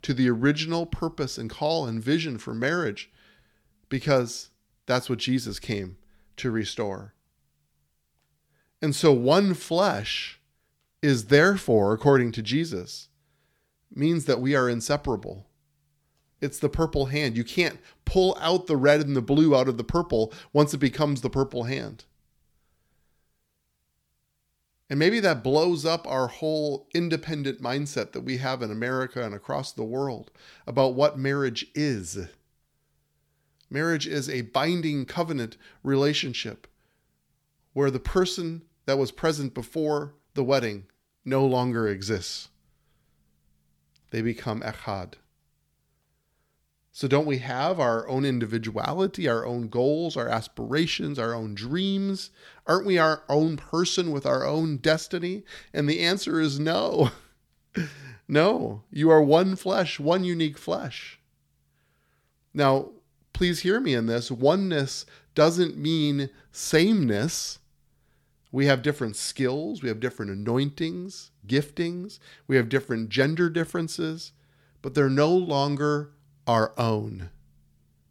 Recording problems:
none

